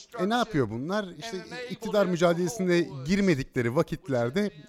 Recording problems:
voice in the background; noticeable; throughout; 15 dB below the speech

